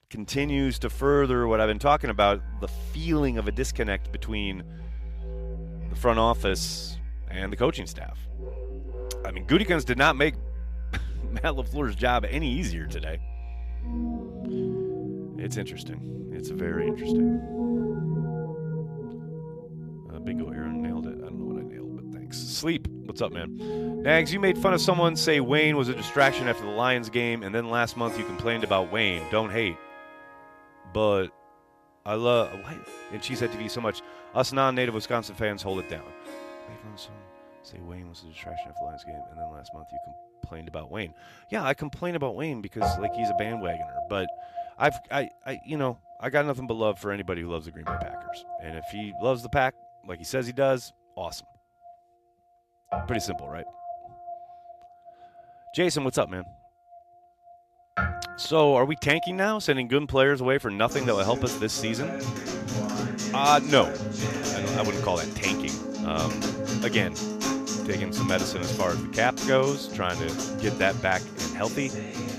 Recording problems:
background music; loud; throughout; 7 dB below the speech

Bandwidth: 14.5 kHz